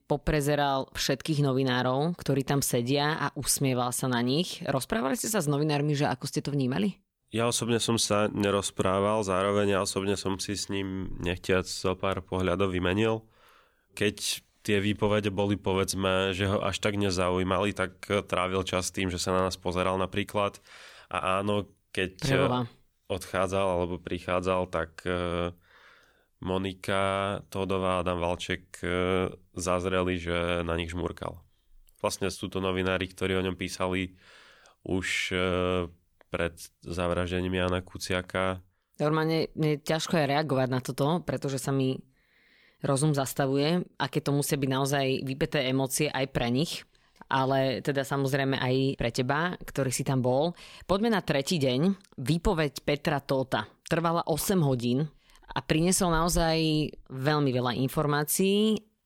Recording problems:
none

